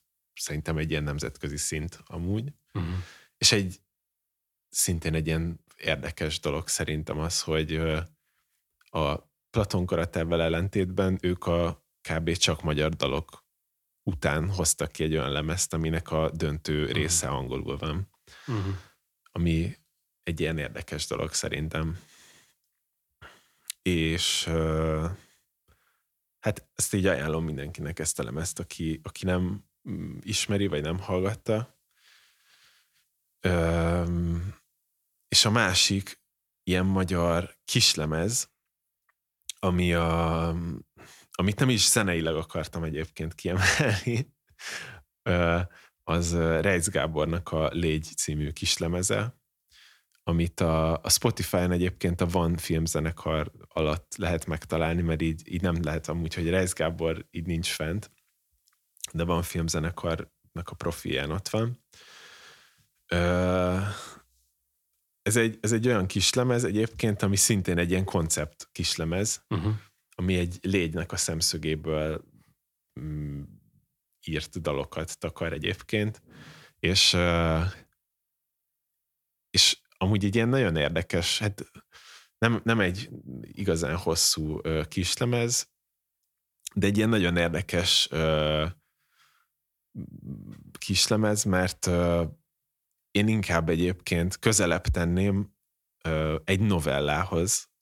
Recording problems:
none

